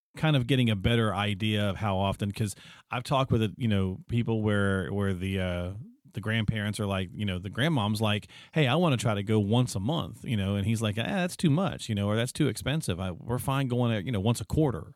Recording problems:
none

